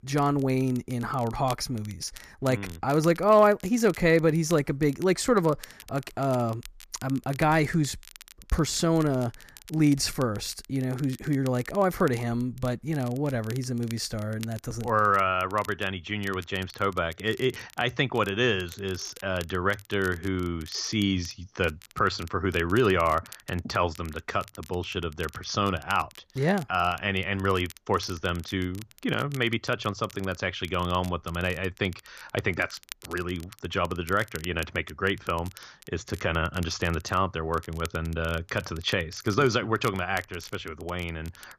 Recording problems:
crackle, like an old record; faint; 20 dB below the speech

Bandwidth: 14.5 kHz